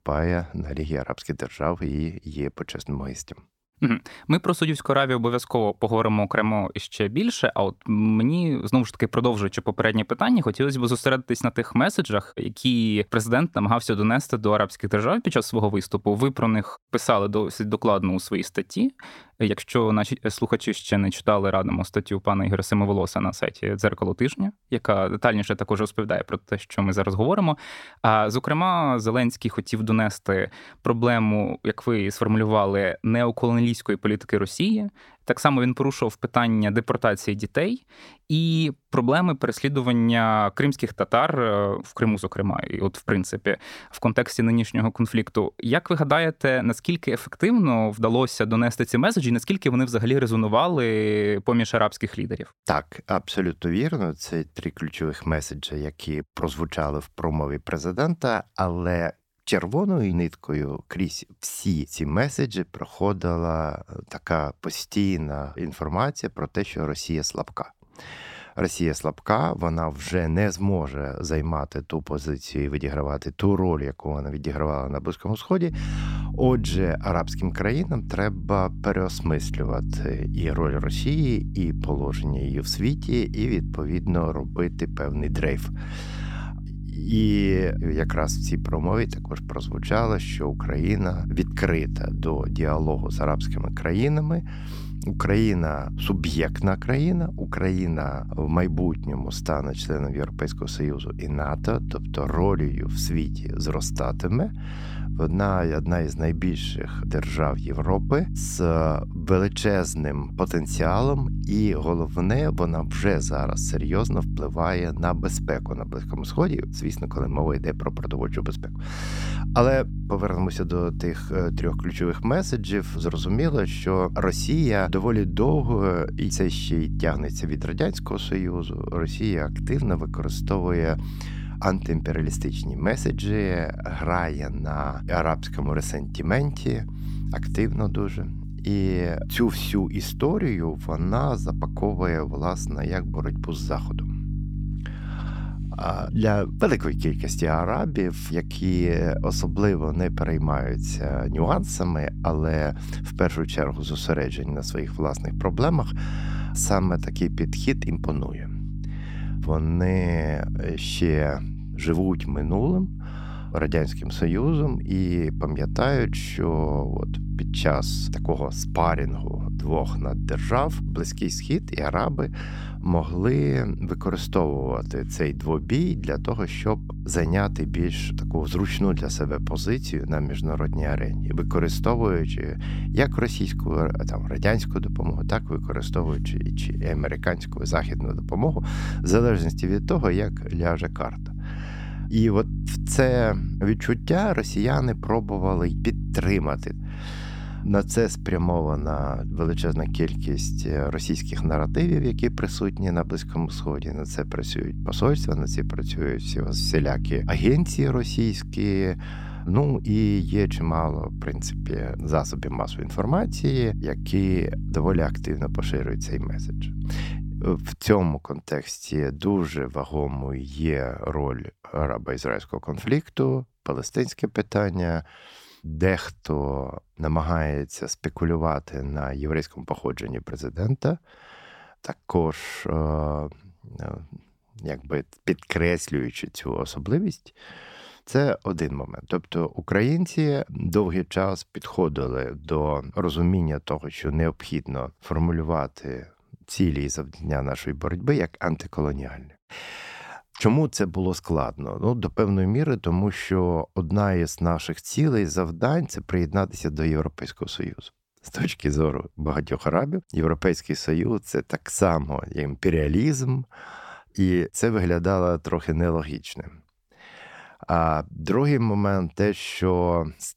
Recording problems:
electrical hum; noticeable; from 1:16 to 3:38; 50 Hz, 15 dB below the speech

